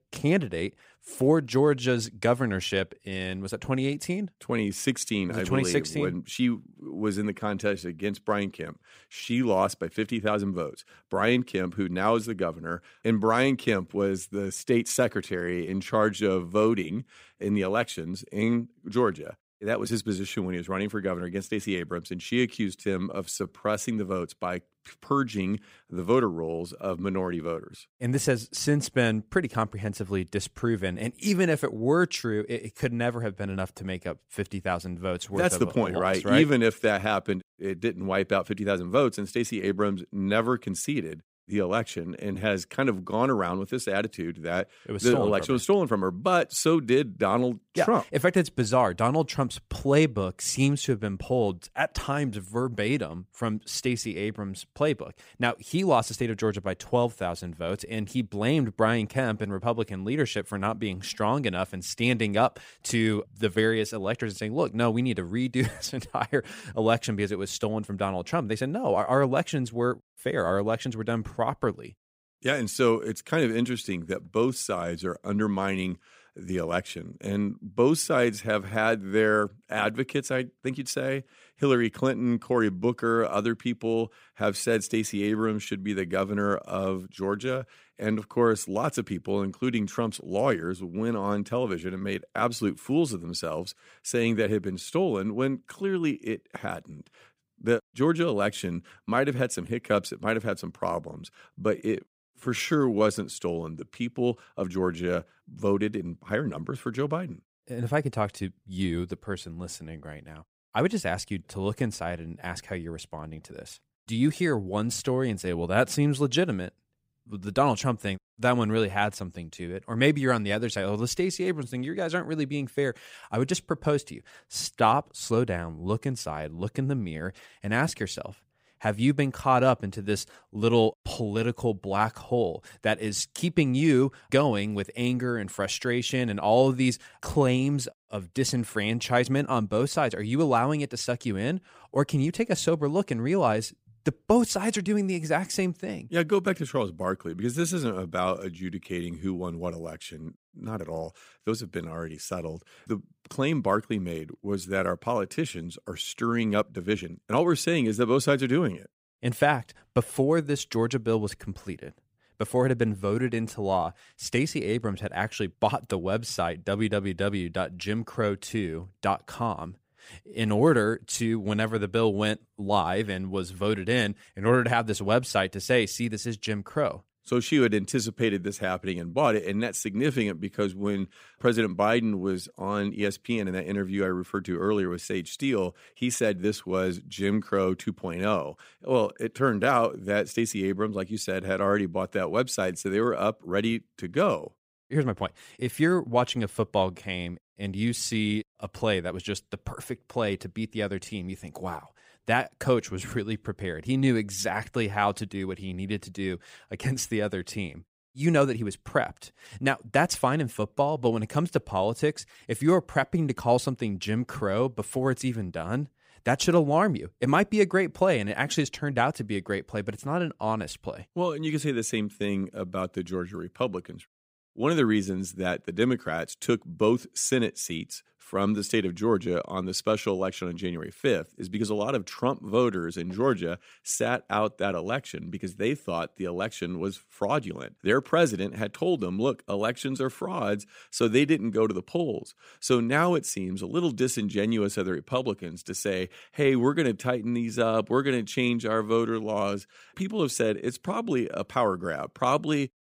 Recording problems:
uneven, jittery; strongly; from 7.5 s to 3:42

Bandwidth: 15.5 kHz